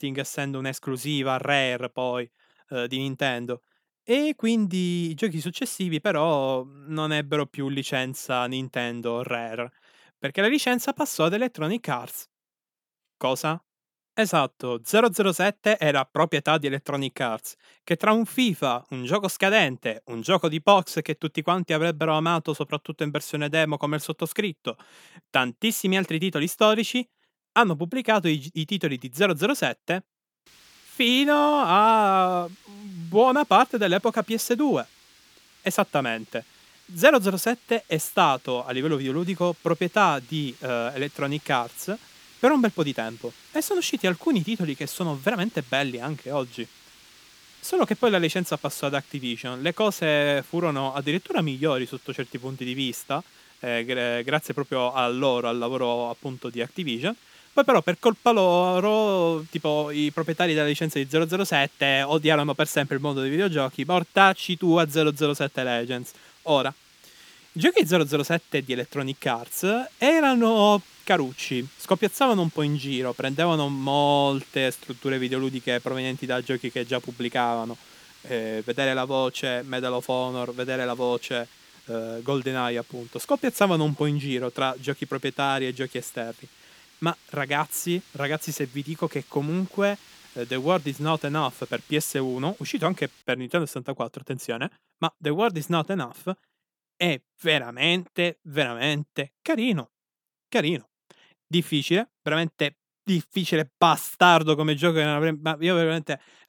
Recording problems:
hiss; faint; from 30 s to 1:33; 25 dB below the speech

